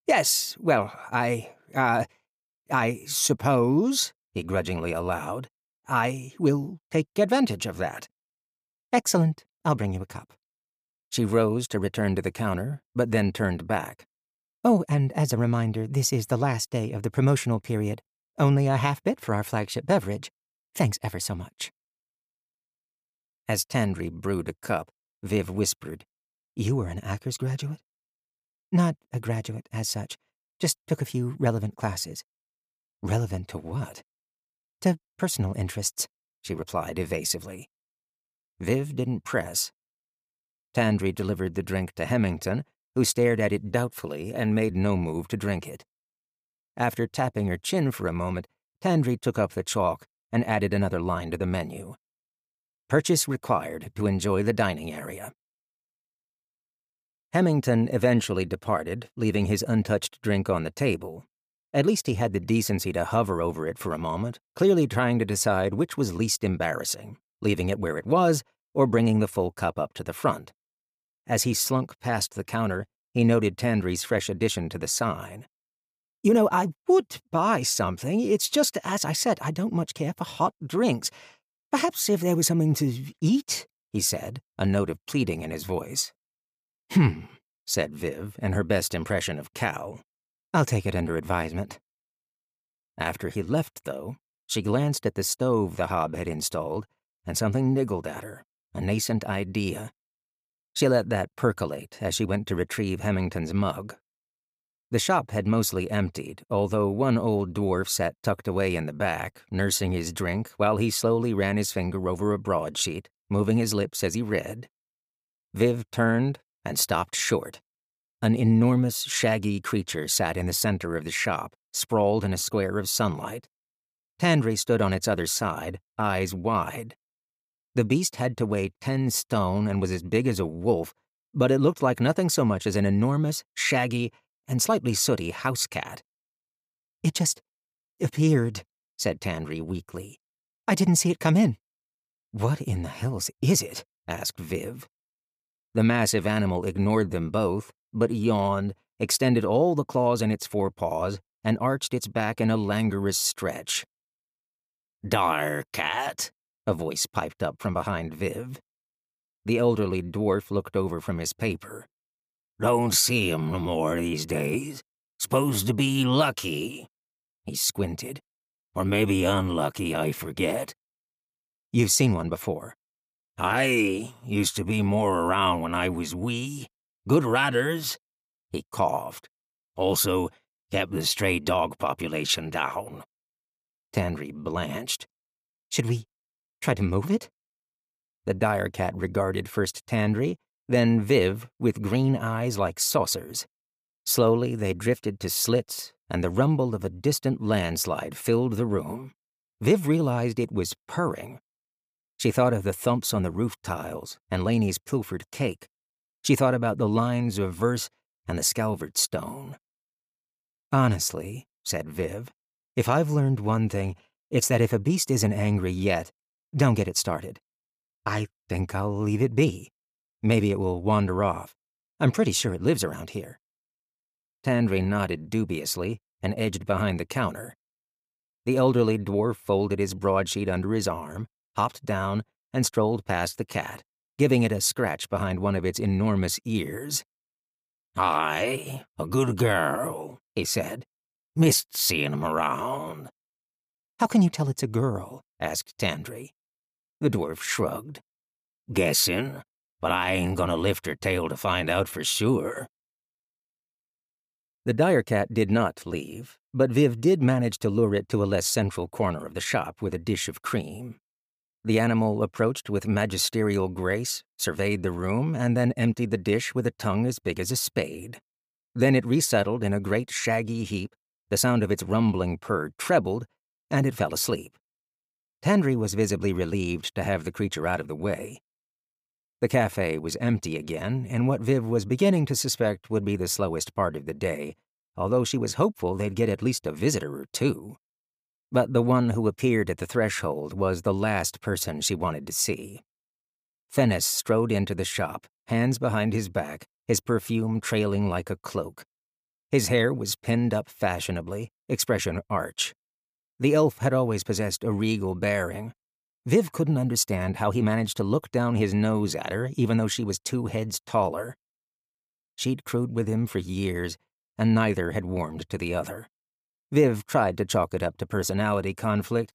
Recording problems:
none

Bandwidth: 15 kHz